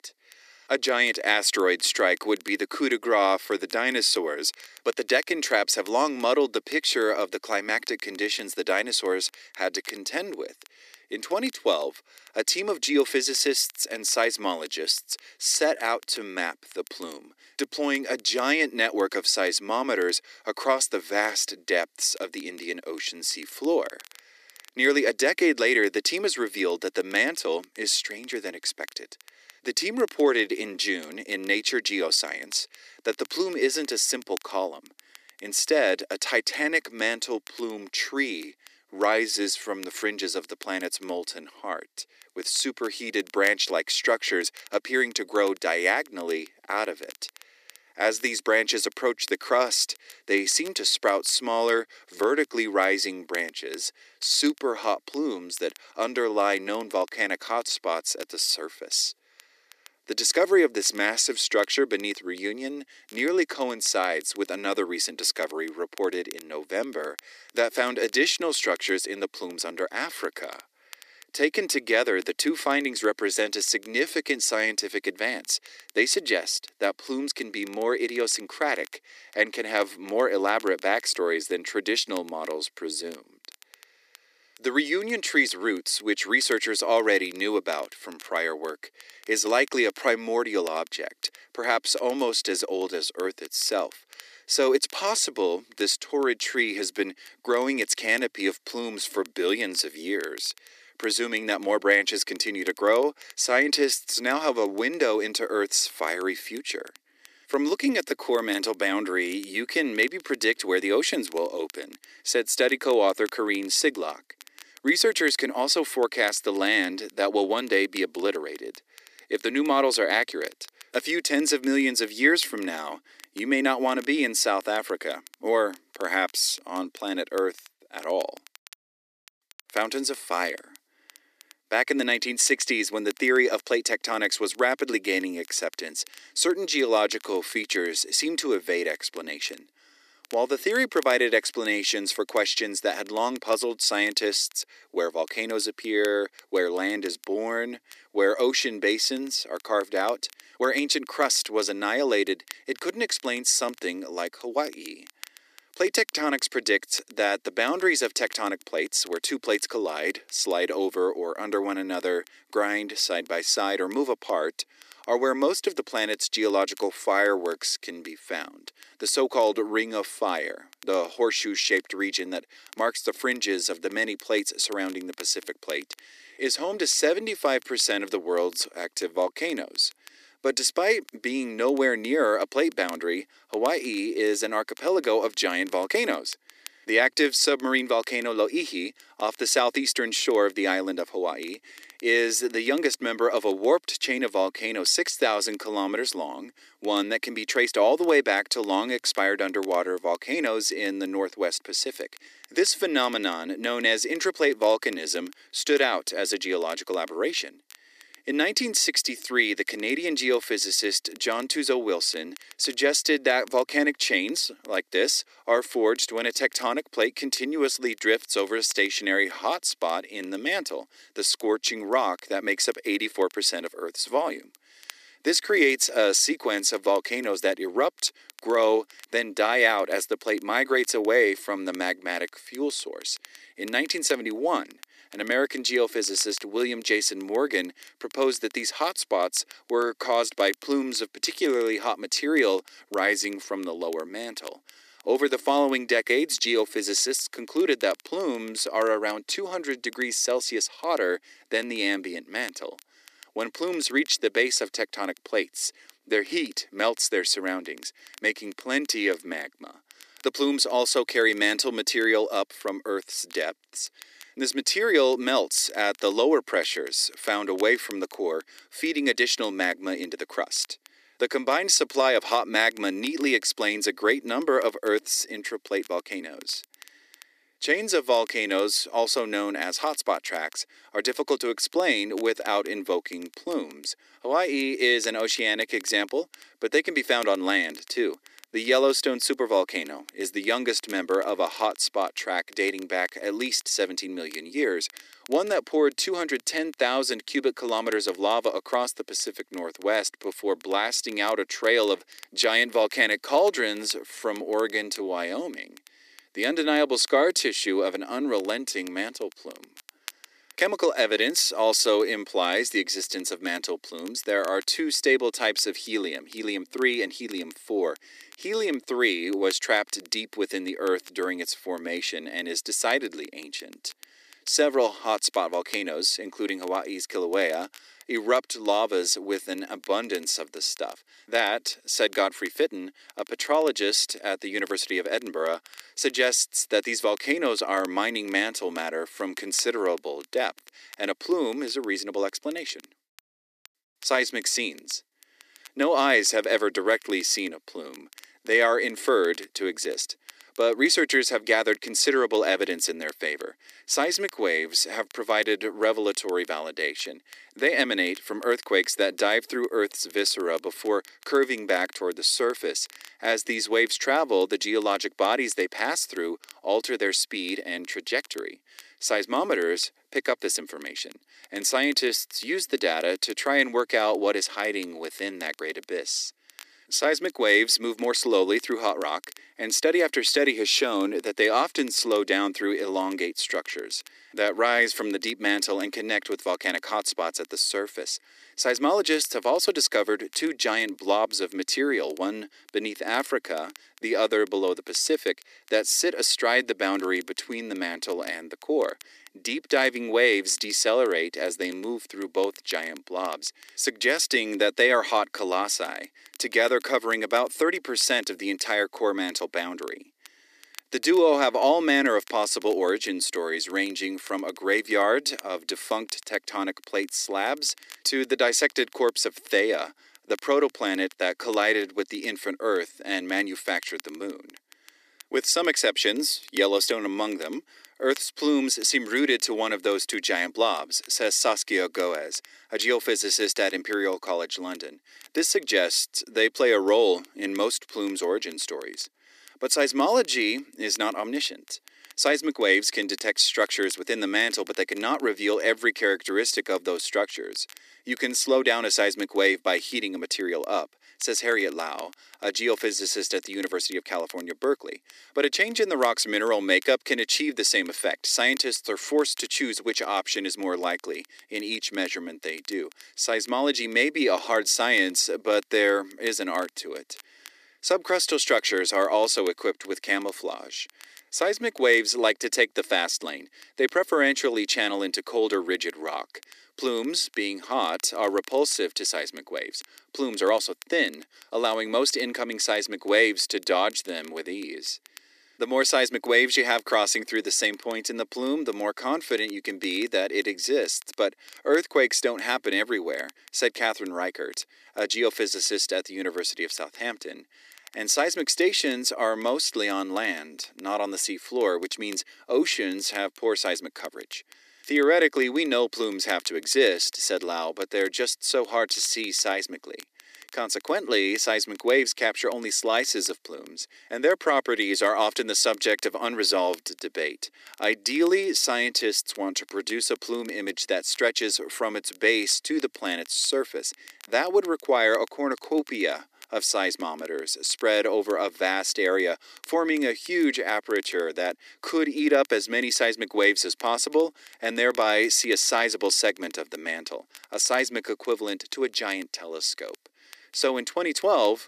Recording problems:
thin; very; fading below 300 Hz
crackle, like an old record; faint; 25 dB below the speech

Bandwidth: 14.5 kHz